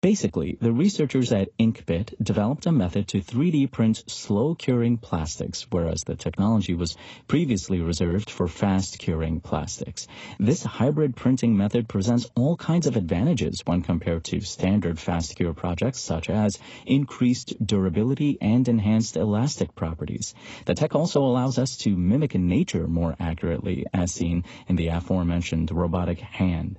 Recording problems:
garbled, watery; badly; nothing above 8 kHz

